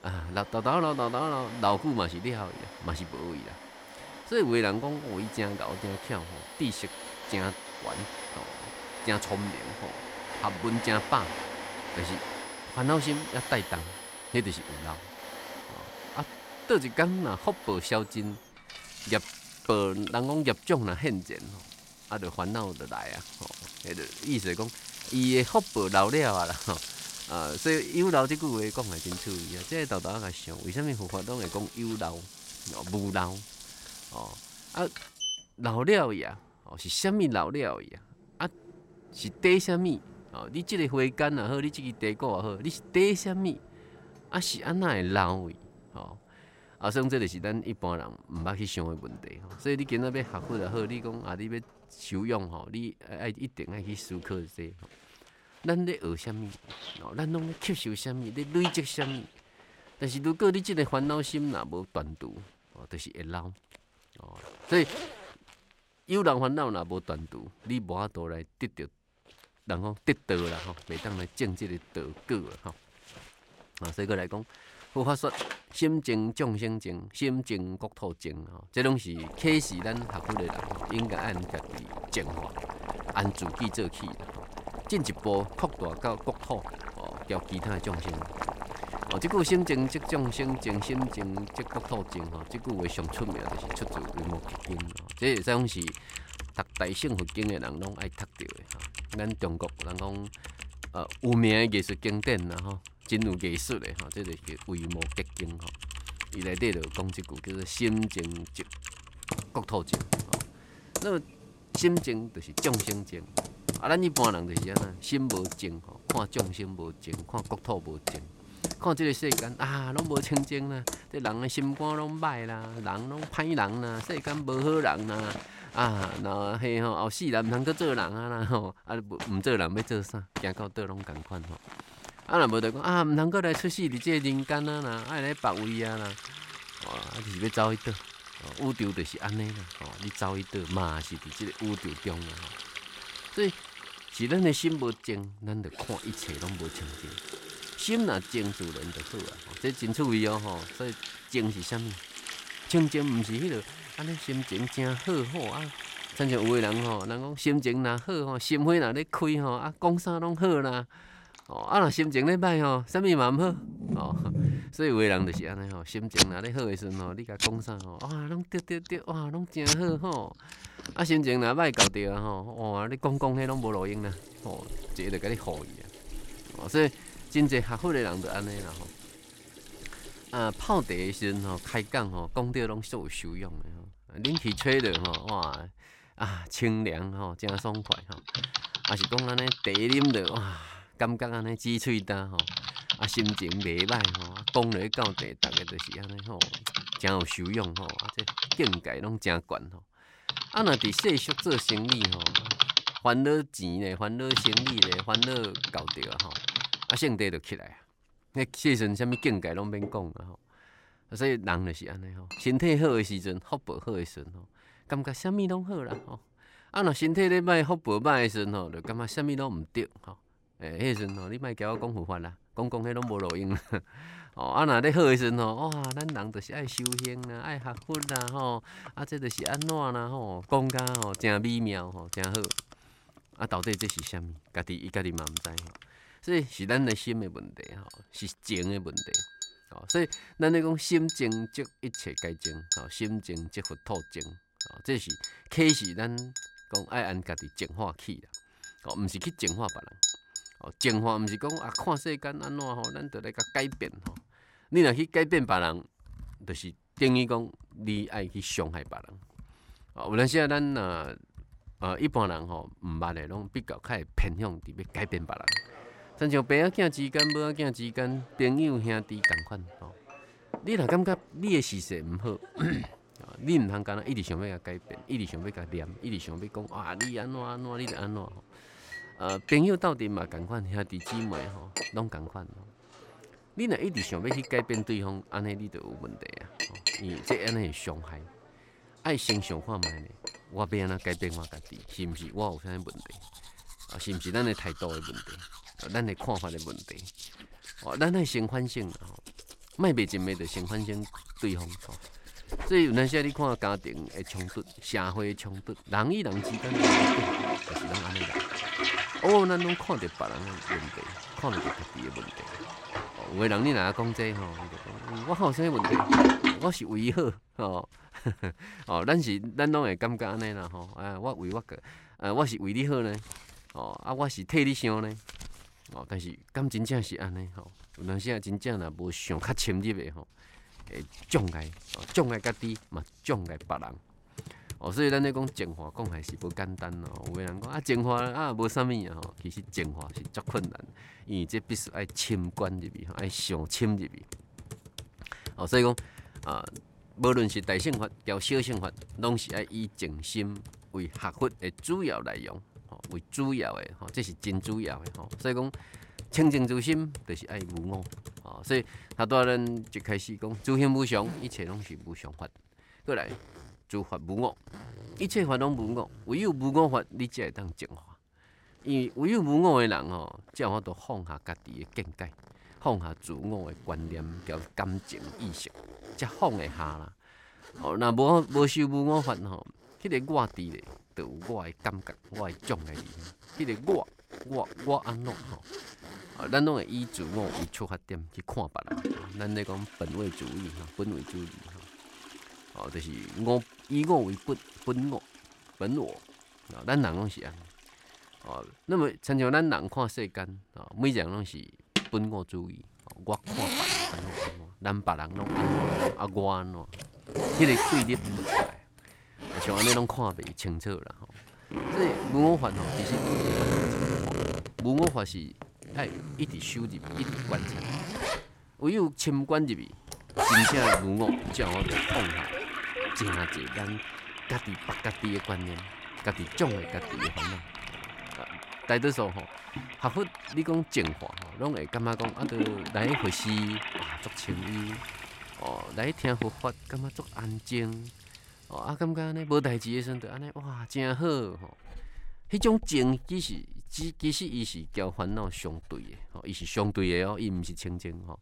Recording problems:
household noises; loud; throughout; 4 dB below the speech

